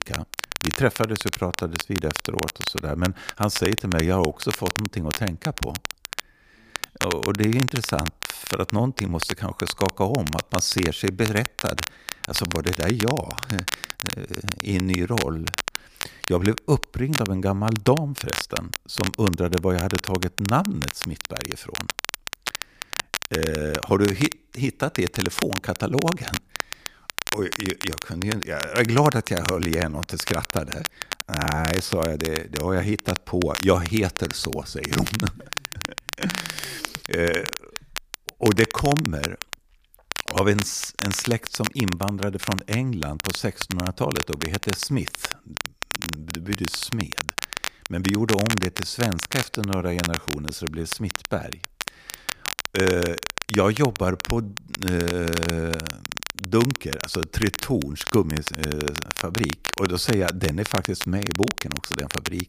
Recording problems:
crackle, like an old record; loud; 5 dB below the speech

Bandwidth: 15 kHz